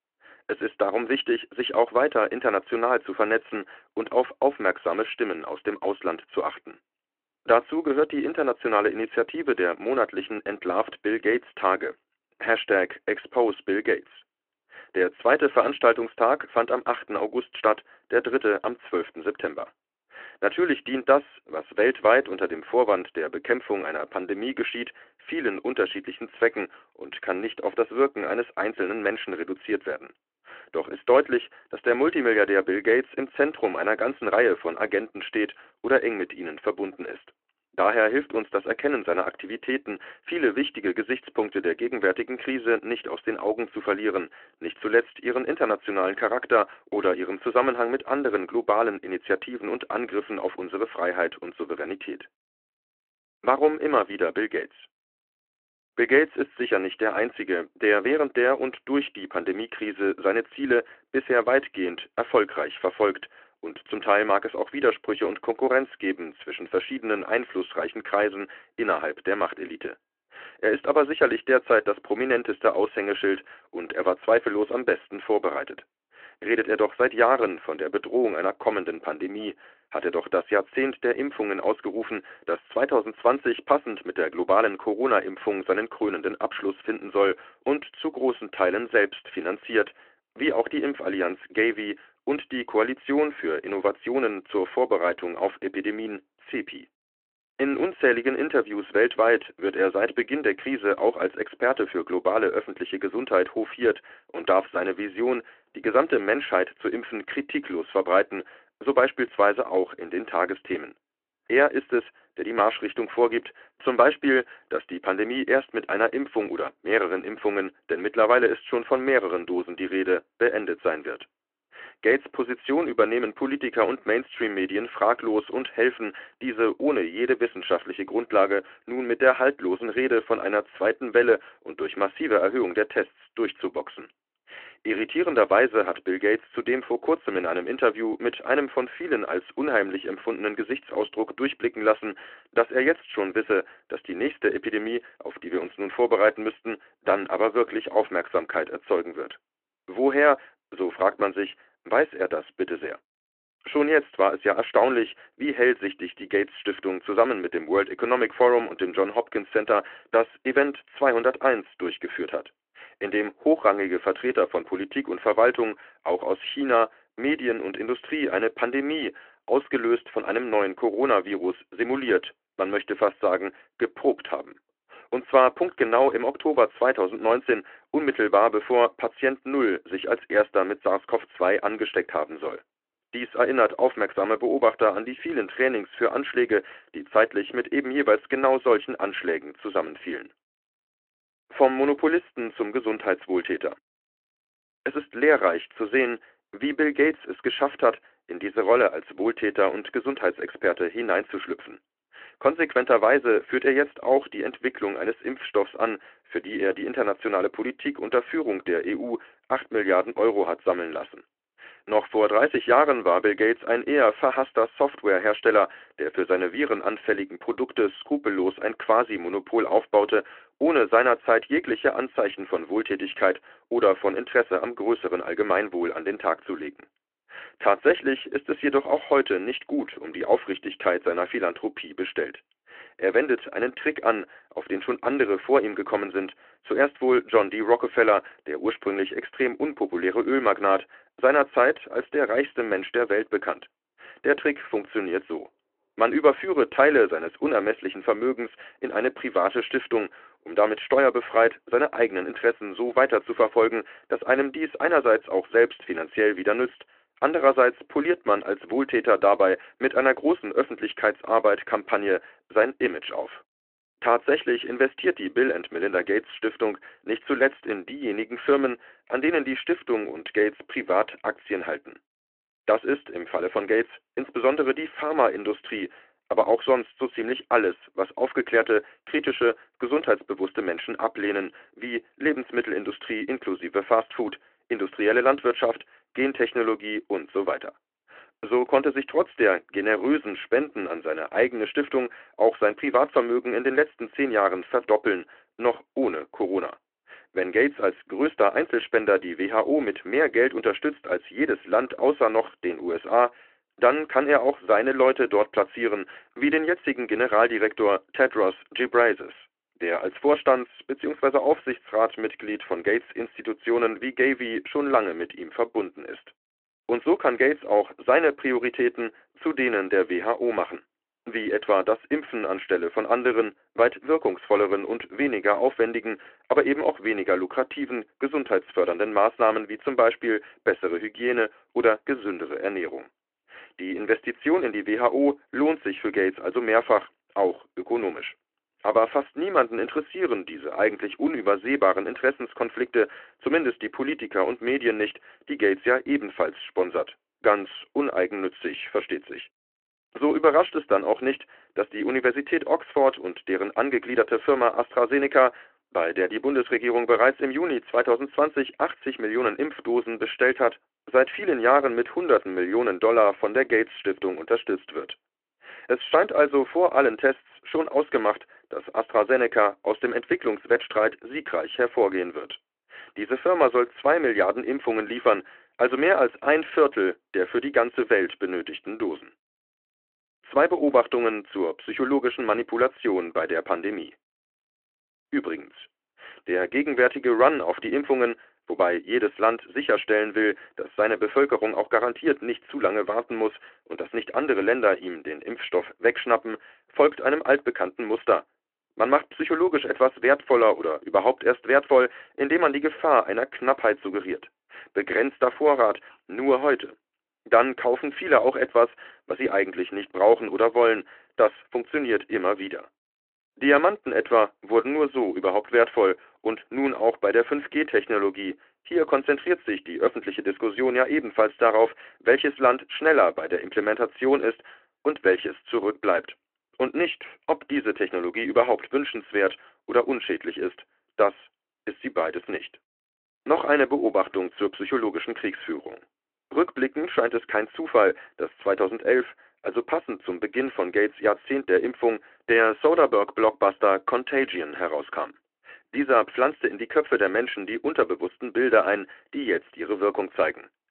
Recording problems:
phone-call audio

